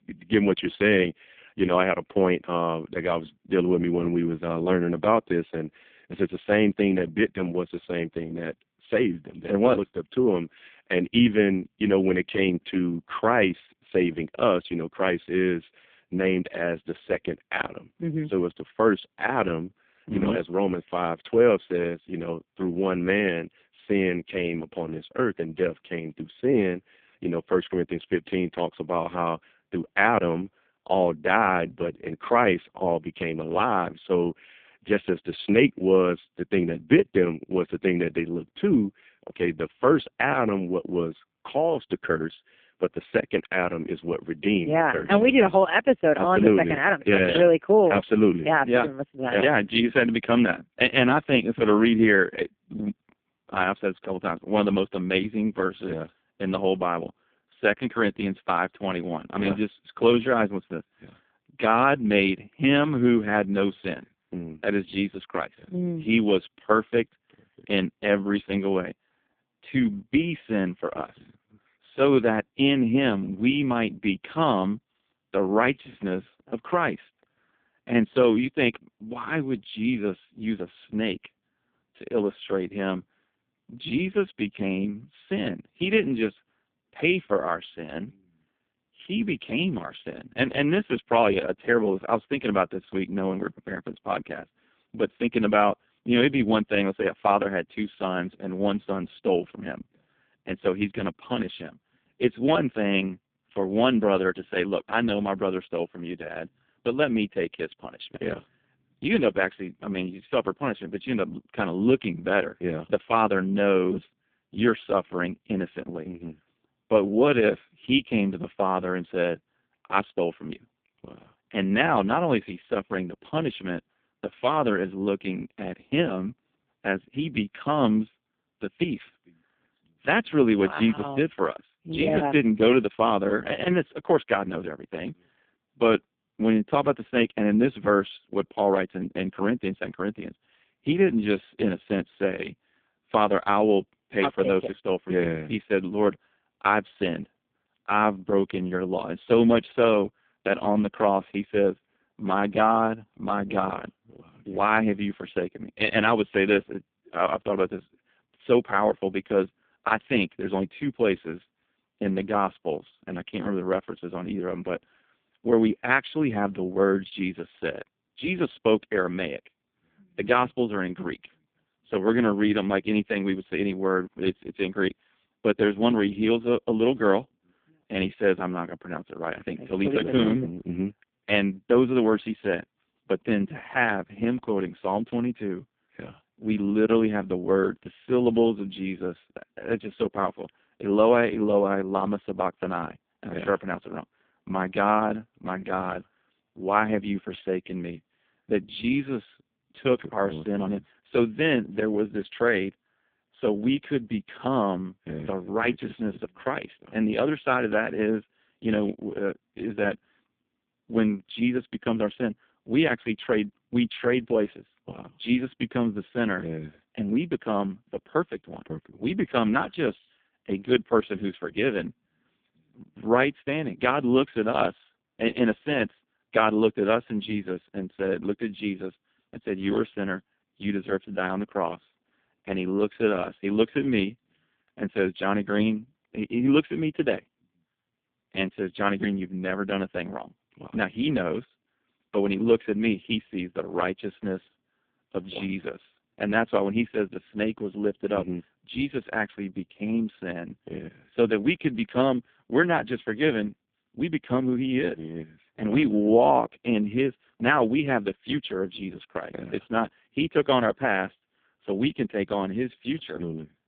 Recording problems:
phone-call audio; poor line

